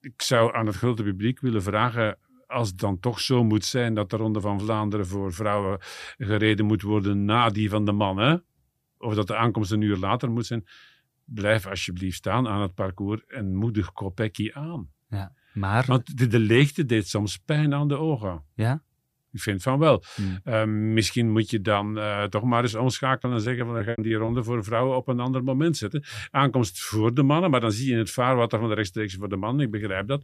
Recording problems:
choppy; very; from 23 to 24 s; 14% of the speech affected

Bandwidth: 15 kHz